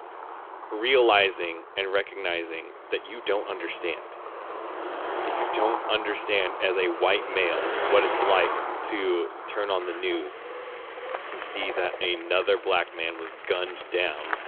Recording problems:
phone-call audio
traffic noise; loud; throughout; 7 dB below the speech

